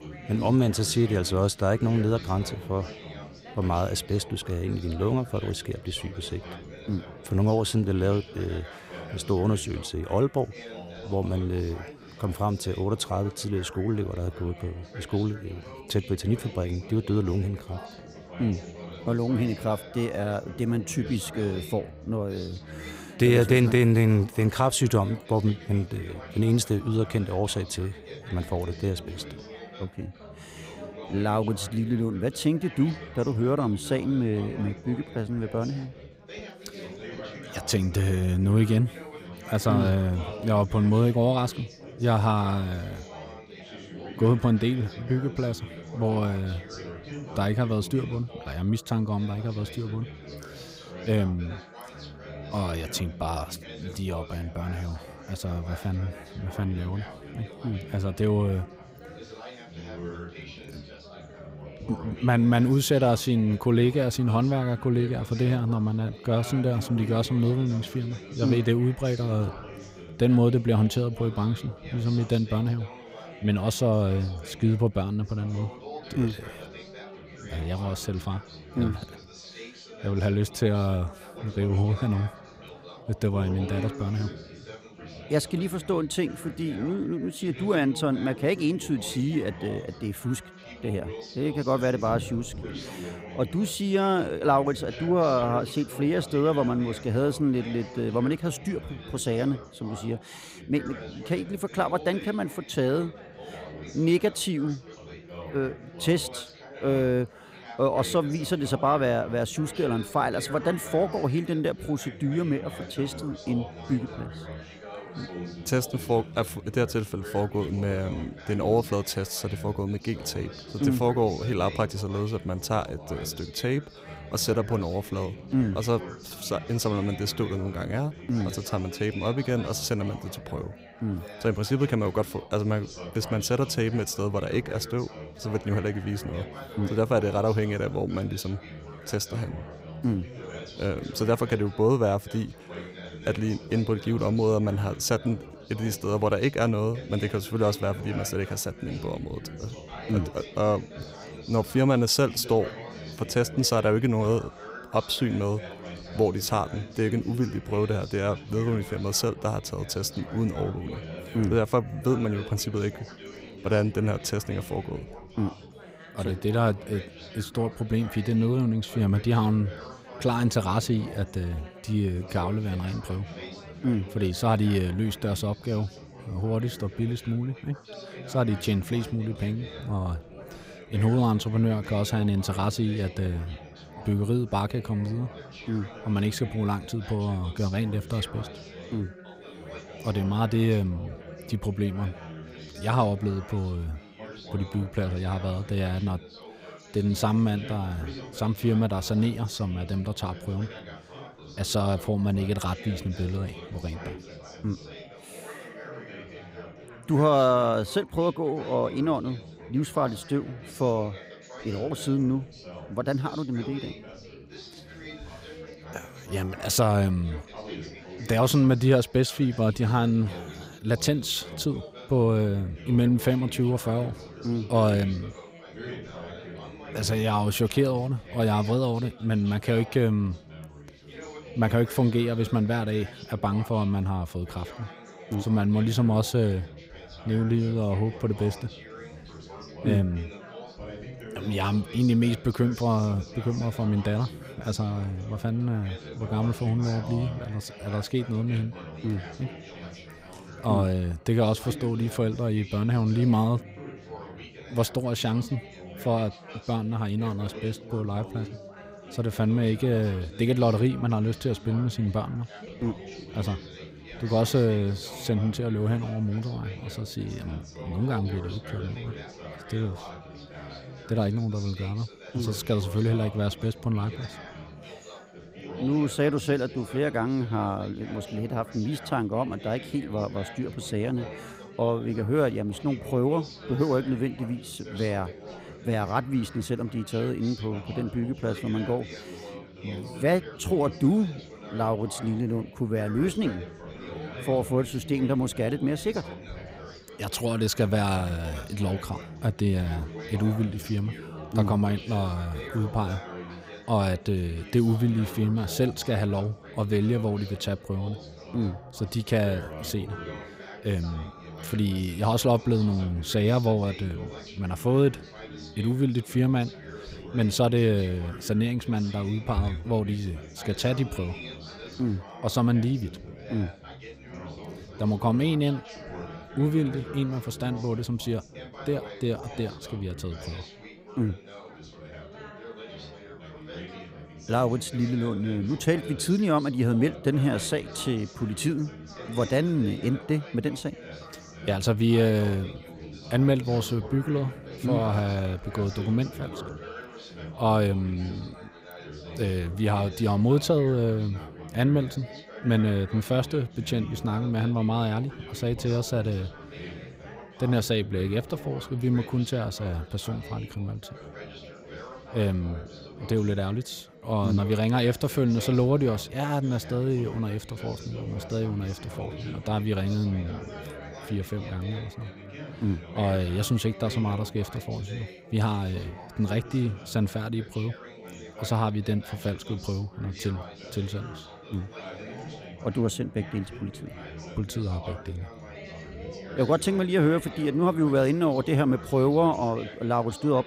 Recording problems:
chatter from many people; noticeable; throughout; 15 dB below the speech

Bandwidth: 15.5 kHz